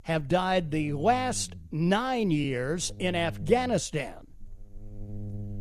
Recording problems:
electrical hum; faint; throughout; 60 Hz, 25 dB below the speech

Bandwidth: 14.5 kHz